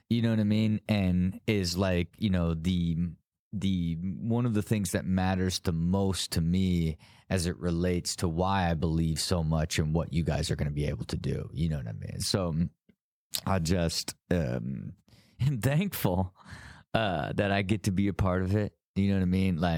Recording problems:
abrupt cut into speech; at the end

